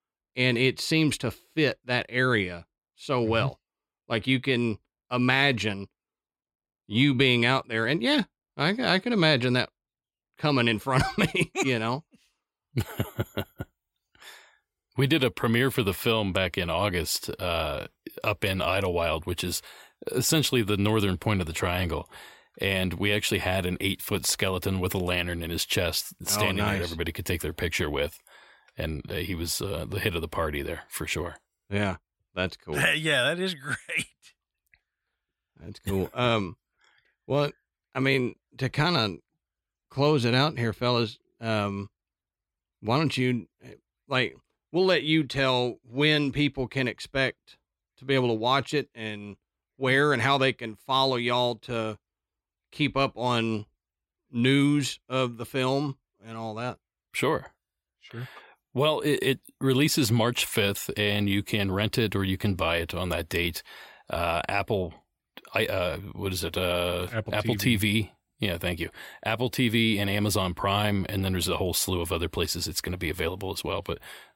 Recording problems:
none

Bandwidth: 16 kHz